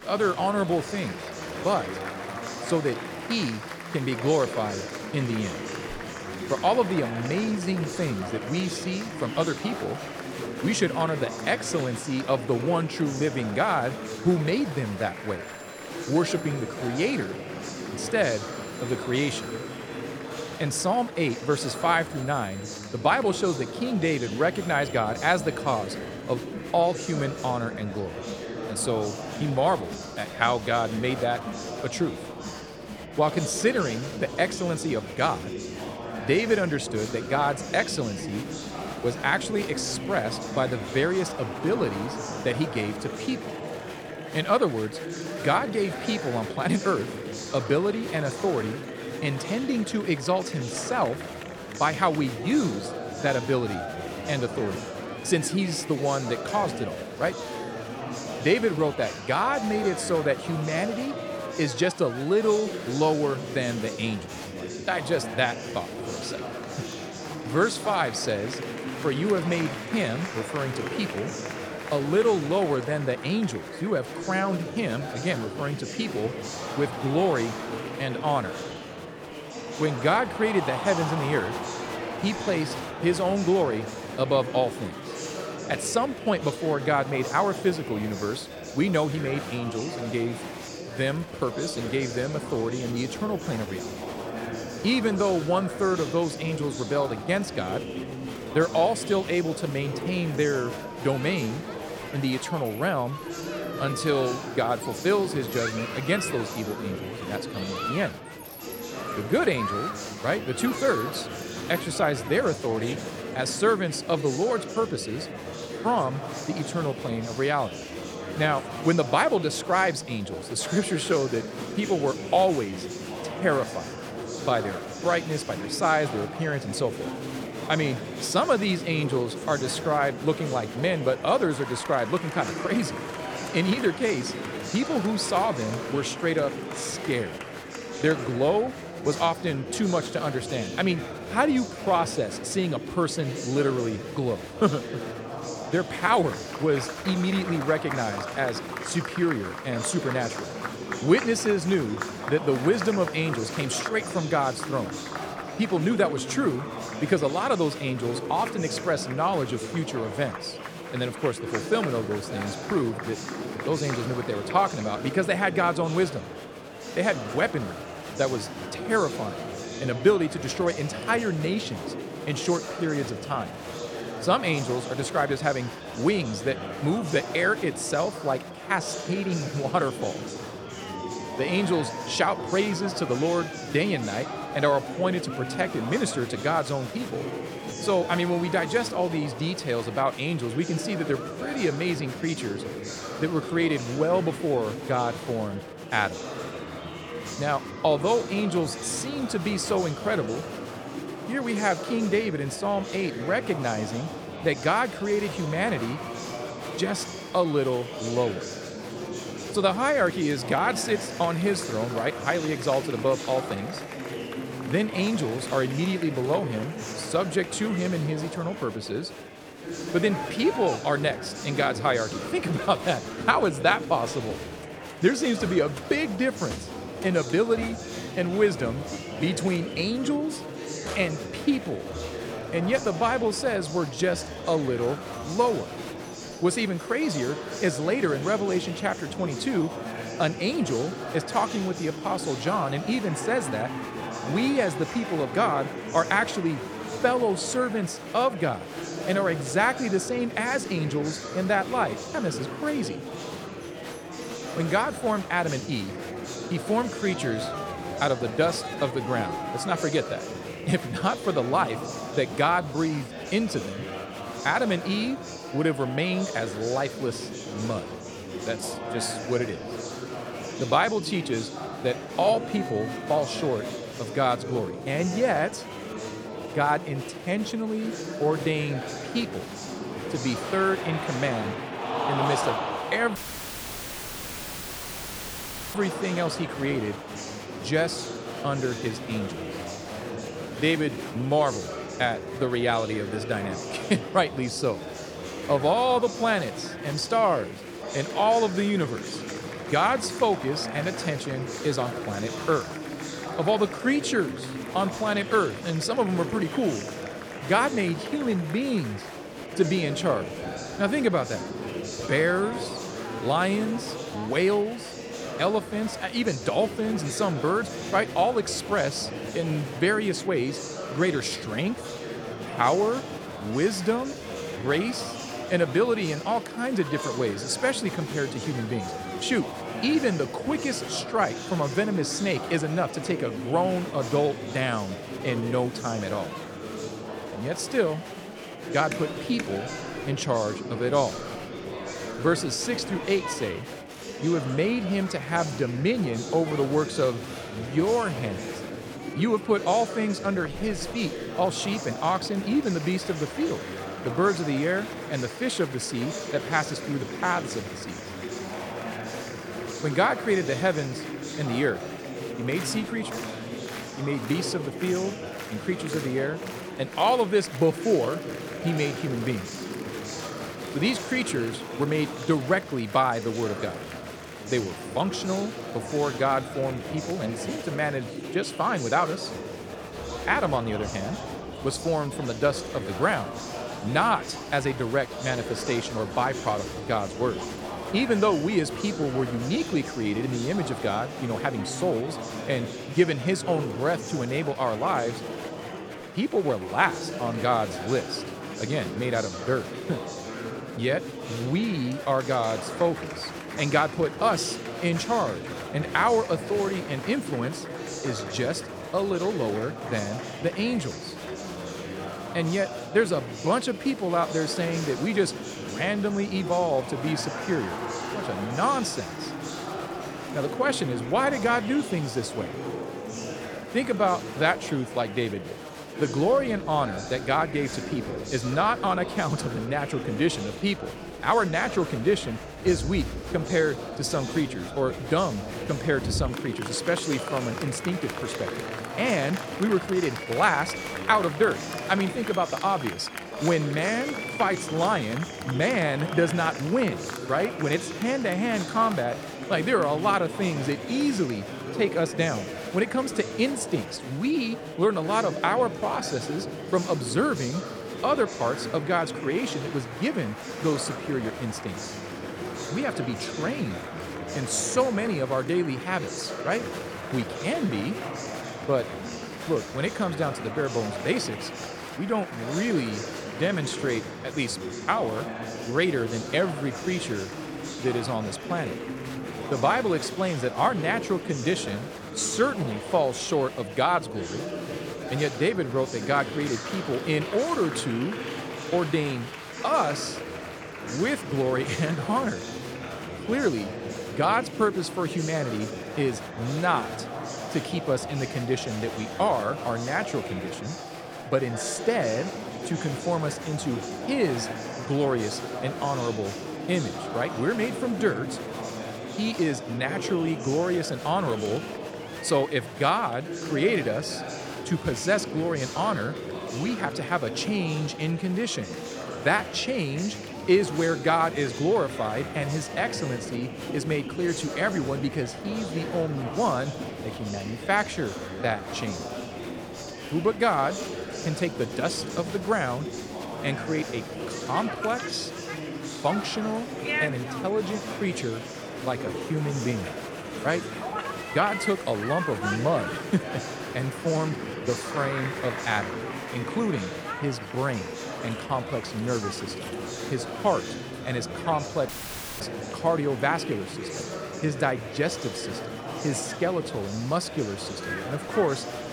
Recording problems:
murmuring crowd; loud; throughout; 7 dB below the speech
alarms or sirens; faint; throughout; 30 dB below the speech
audio cutting out; at 4:43 for 2.5 s and at 9:12 for 0.5 s

